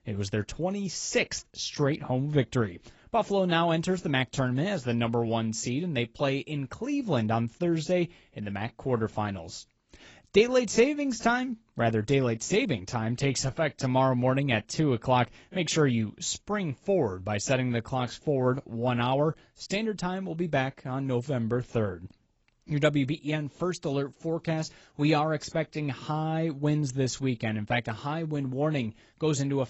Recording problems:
garbled, watery; badly; nothing above 8 kHz

